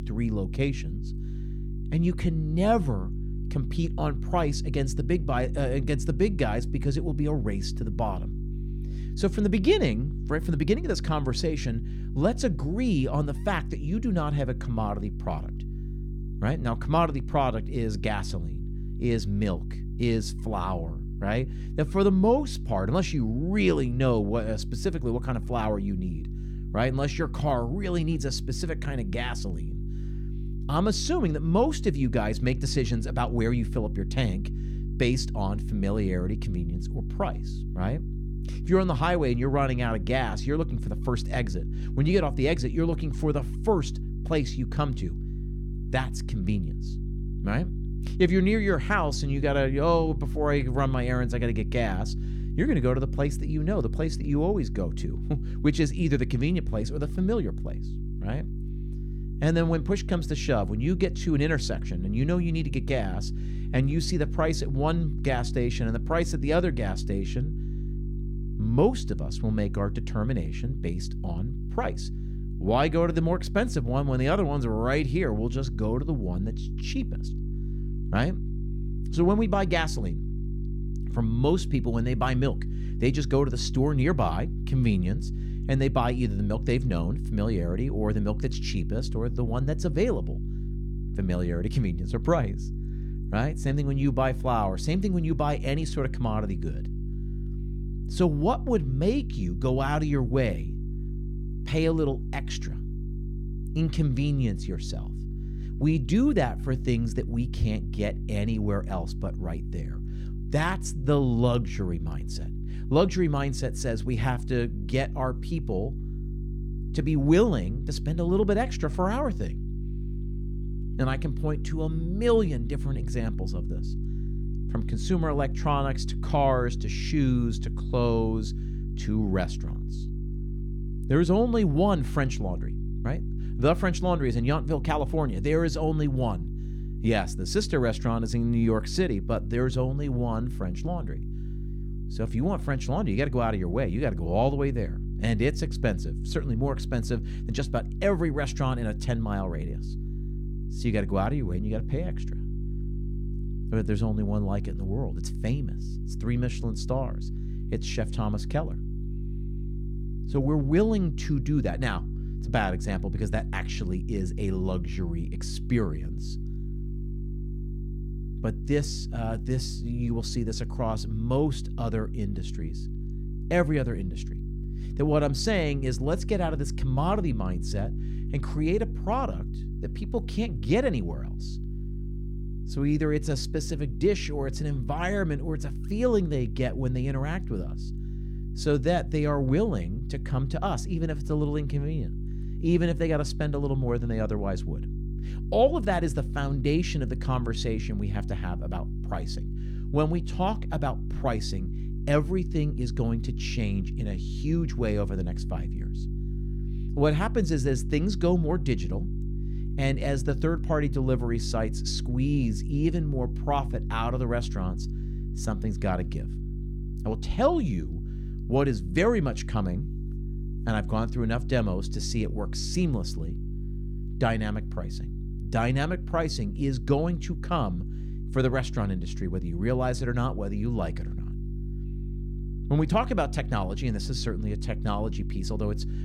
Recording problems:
electrical hum; noticeable; throughout; 50 Hz, 15 dB below the speech

